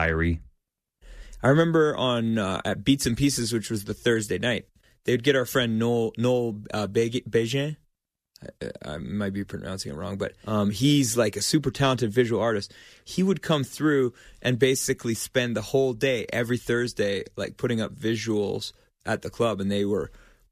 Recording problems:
abrupt cut into speech; at the start

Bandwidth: 14.5 kHz